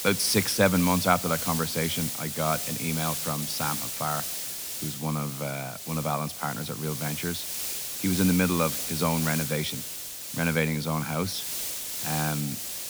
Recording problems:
hiss; loud; throughout; 3 dB below the speech

